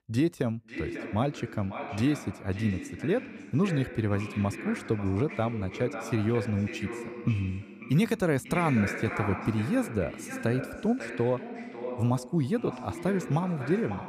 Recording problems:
echo of what is said; strong; throughout; 550 ms later, 9 dB below the speech

